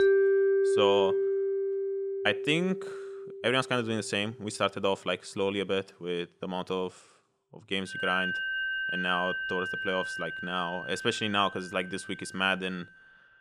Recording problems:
background music; very loud; throughout; as loud as the speech

